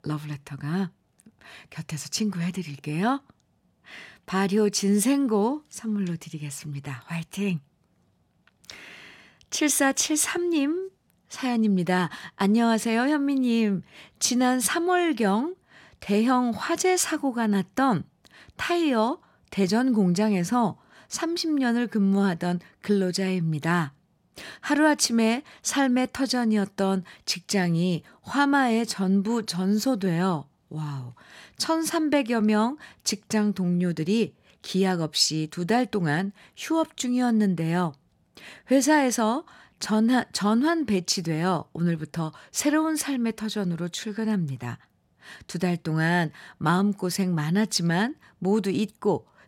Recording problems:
none

